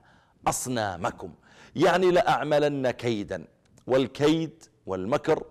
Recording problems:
distortion; slight; 4% of the sound clipped

